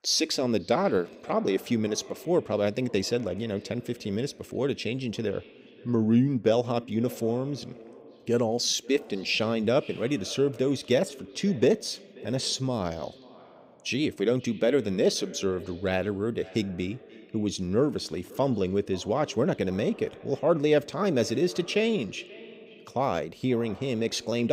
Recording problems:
echo of what is said; faint; throughout; 530 ms later, 20 dB below the speech
abrupt cut into speech; at the end

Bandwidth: 15.5 kHz